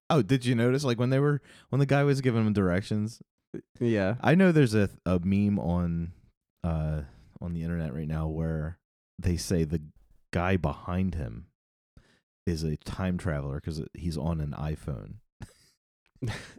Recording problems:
none

